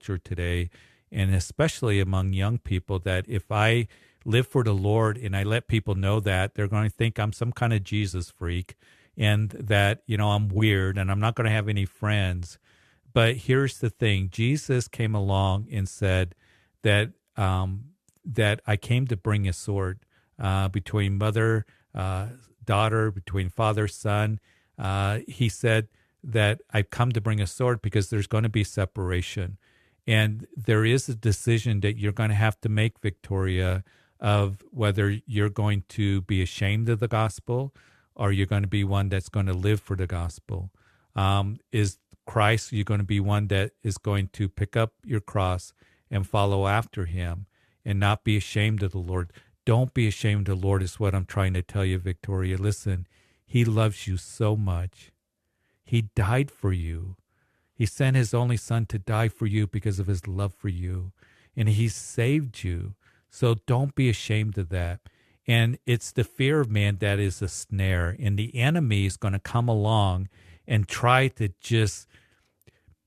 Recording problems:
none

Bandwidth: 13.5 kHz